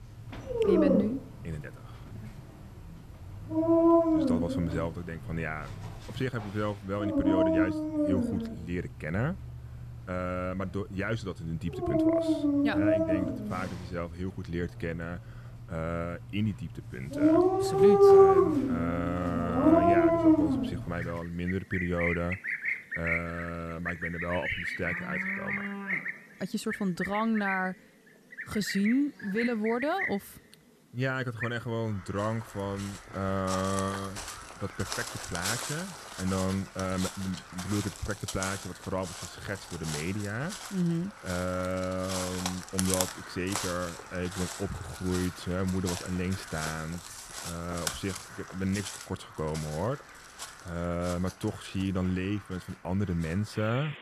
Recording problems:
animal sounds; very loud; throughout; 5 dB above the speech

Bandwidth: 13.5 kHz